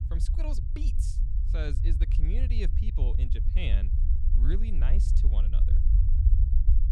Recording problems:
low rumble; loud; throughout; 3 dB below the speech

